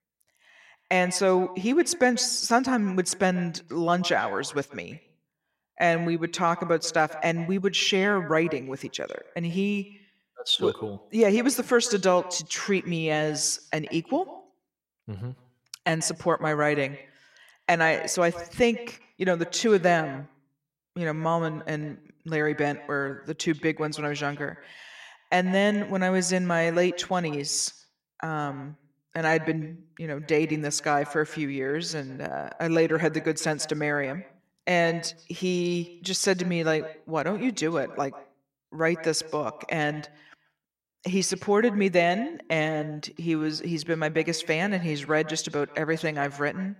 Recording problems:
echo of what is said; noticeable; throughout; 140 ms later, 20 dB below the speech

